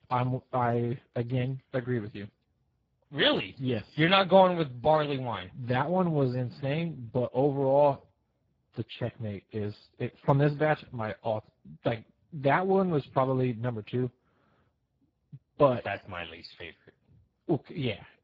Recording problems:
garbled, watery; badly; nothing above 7.5 kHz

